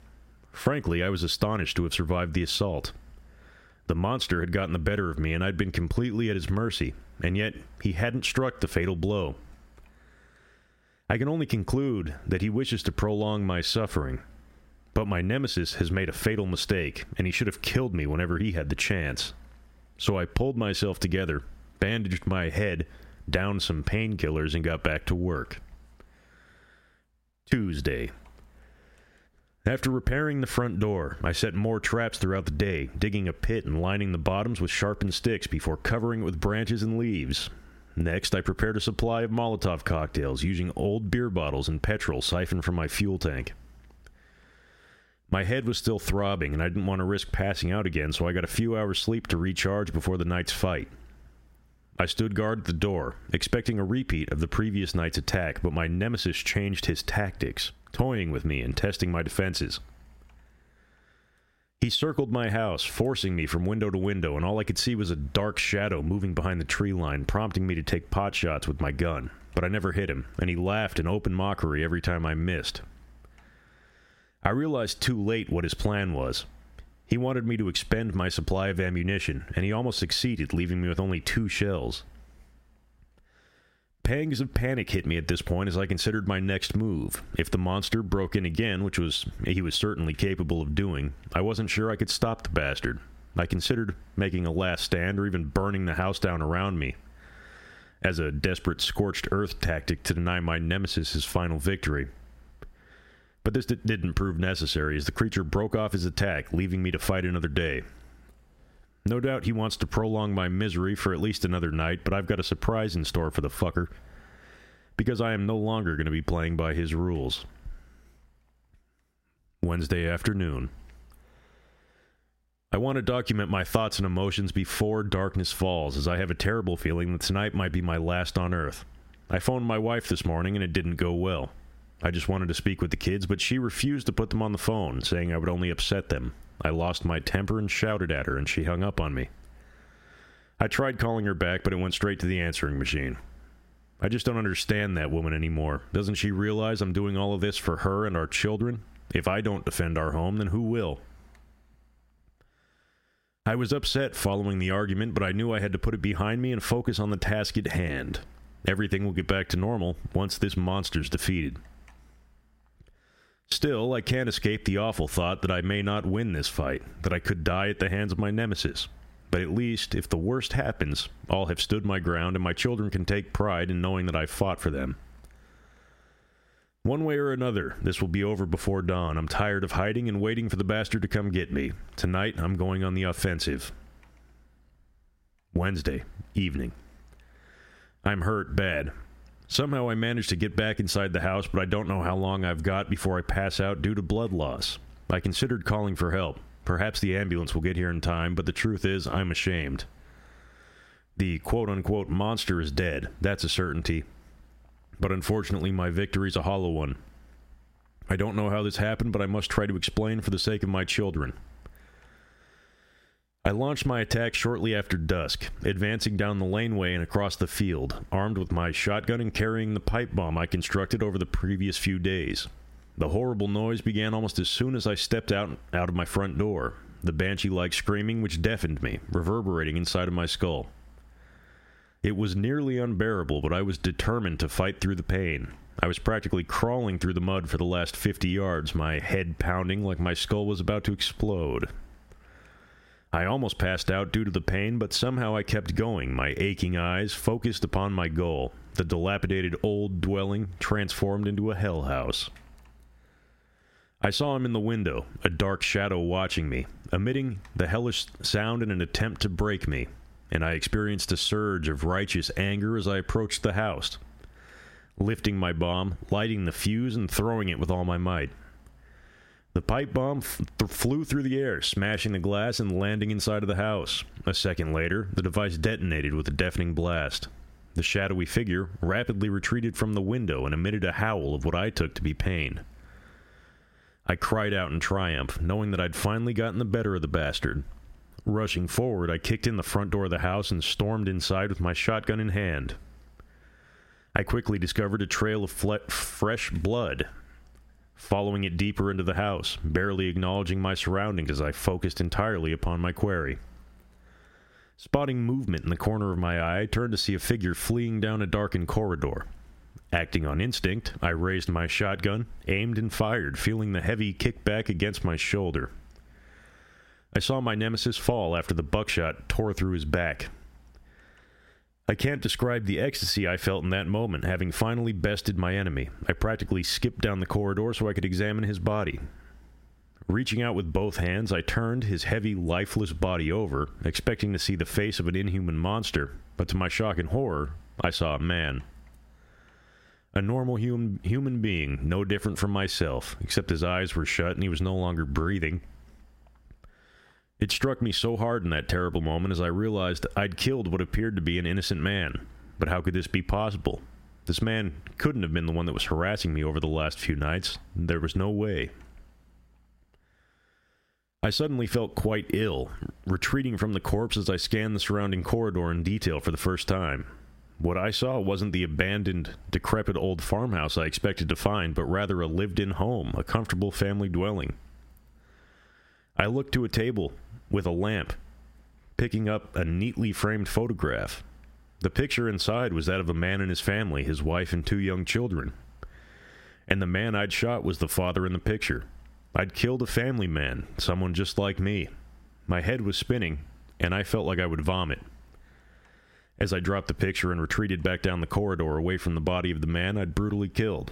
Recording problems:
squashed, flat; heavily

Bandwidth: 16 kHz